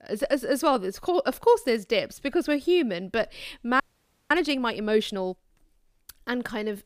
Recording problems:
audio freezing; at 4 s for 0.5 s

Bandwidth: 15 kHz